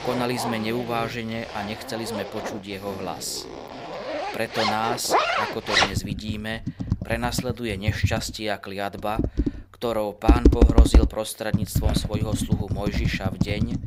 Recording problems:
household noises; very loud; throughout; 4 dB above the speech

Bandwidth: 15.5 kHz